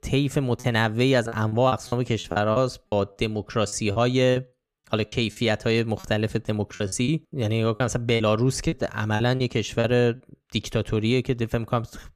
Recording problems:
choppy; very; 9% of the speech affected

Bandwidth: 14.5 kHz